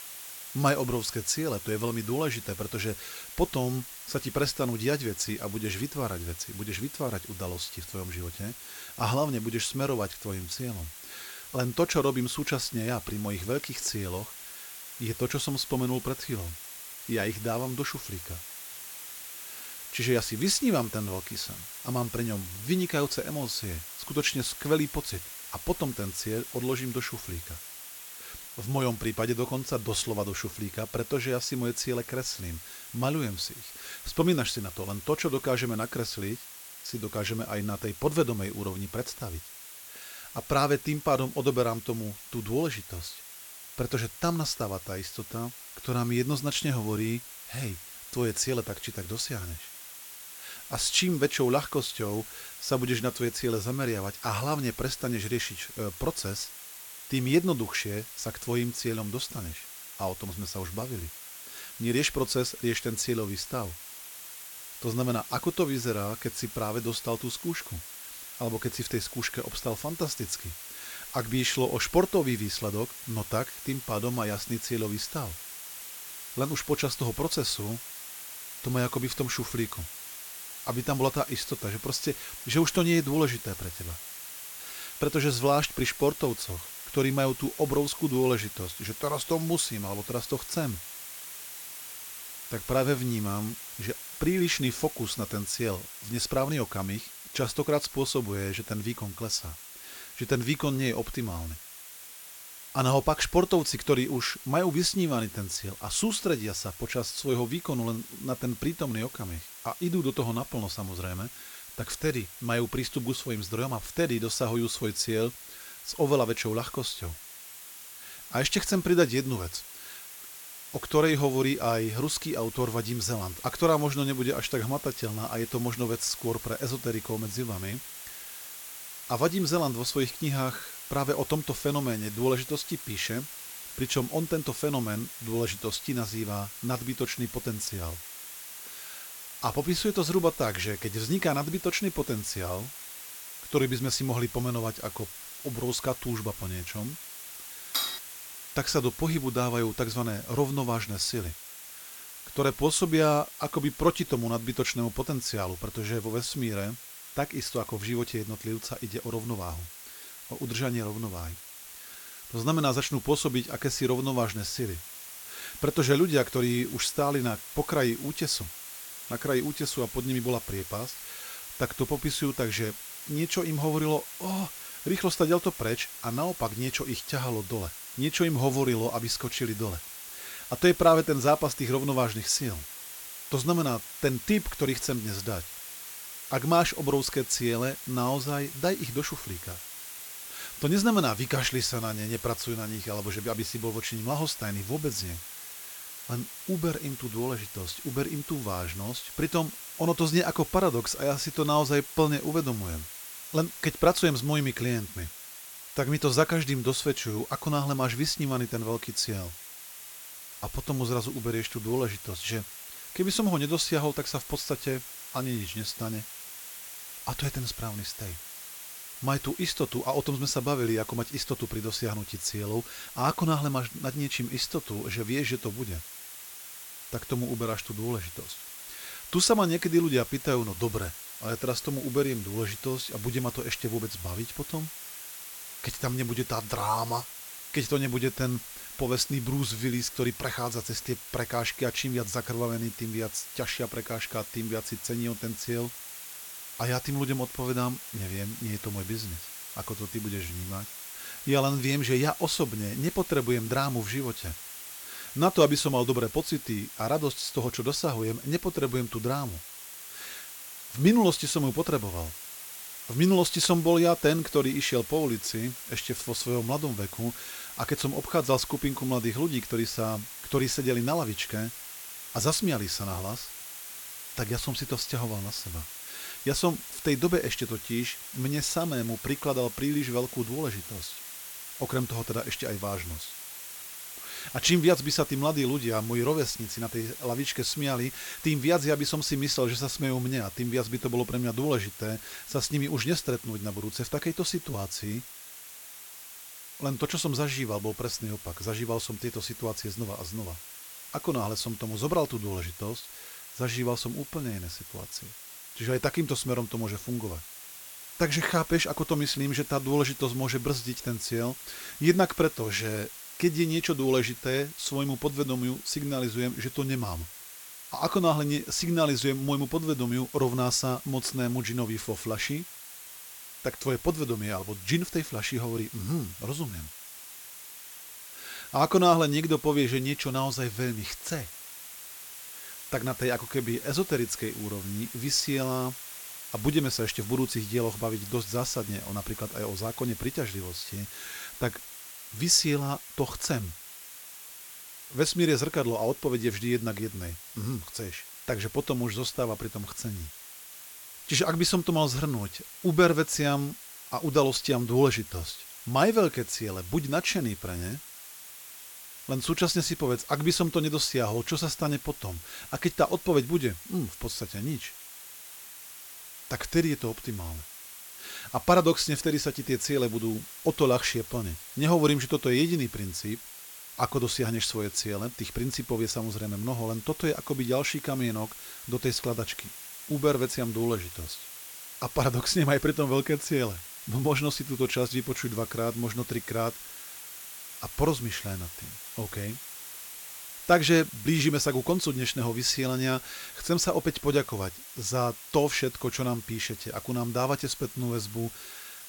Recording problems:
hiss; noticeable; throughout; 10 dB below the speech
clattering dishes; loud; at 2:28; peak level with the speech

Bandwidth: 17.5 kHz